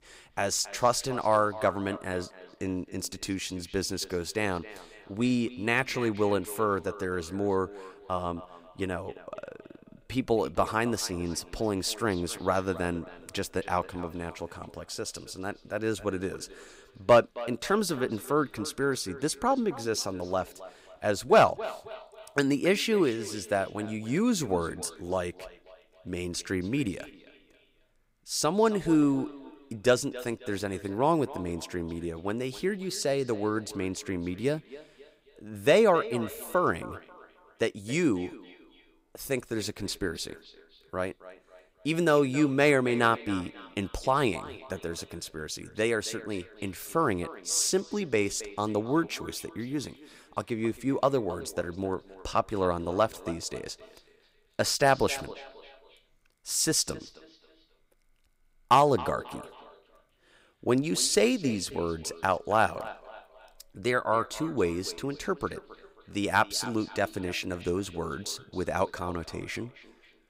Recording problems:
echo of what is said; noticeable; throughout; 270 ms later, 15 dB below the speech

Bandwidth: 15.5 kHz